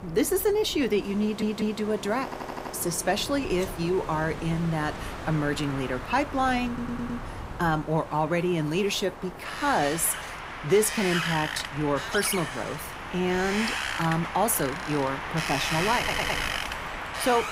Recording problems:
wind in the background; loud; throughout; 6 dB below the speech
audio stuttering; 4 times, first at 1 s

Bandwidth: 15.5 kHz